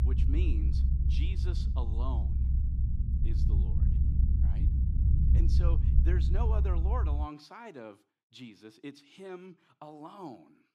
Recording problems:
low rumble; loud; until 7.5 s; 2 dB below the speech

